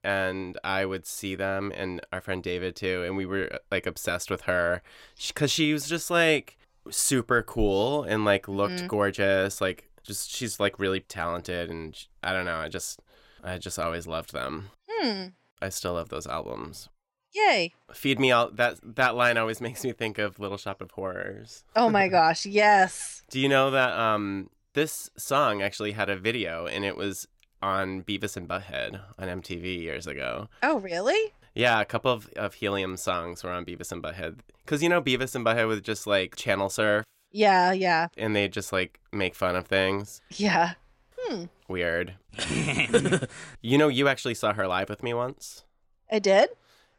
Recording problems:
none

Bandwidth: 16 kHz